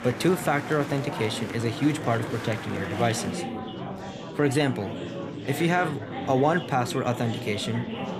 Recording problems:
murmuring crowd; loud; throughout; 7 dB below the speech

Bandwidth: 14.5 kHz